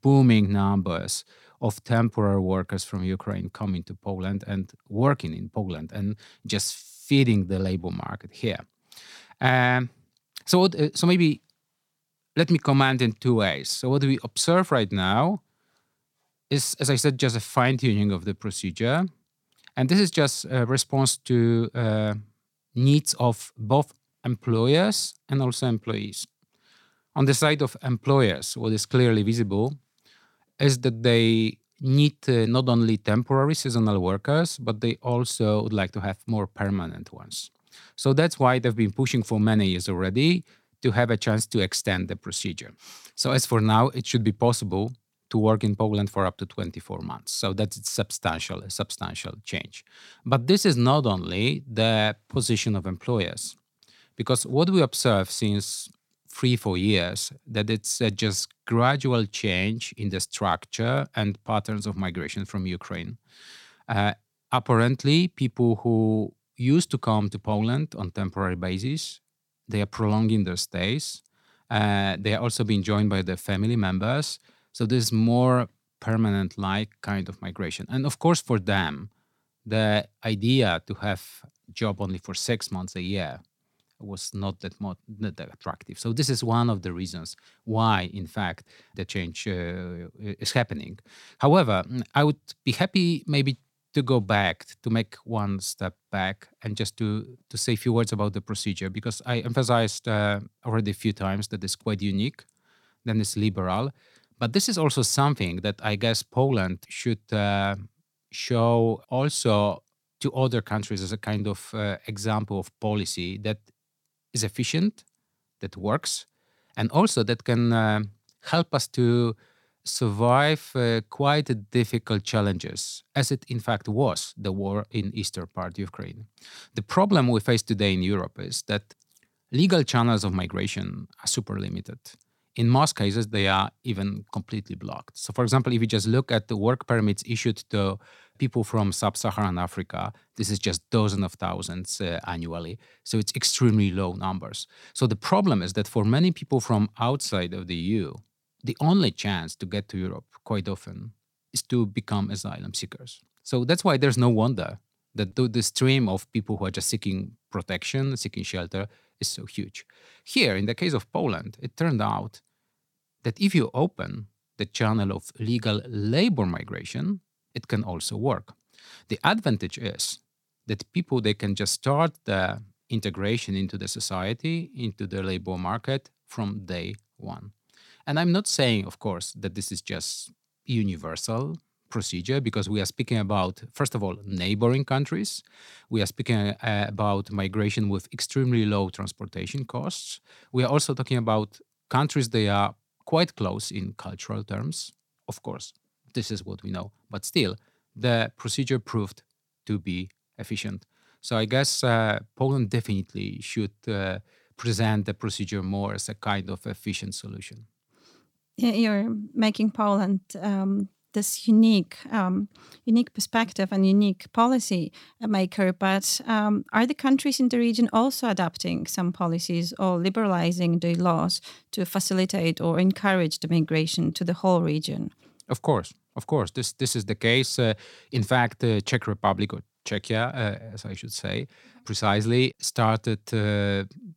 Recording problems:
none

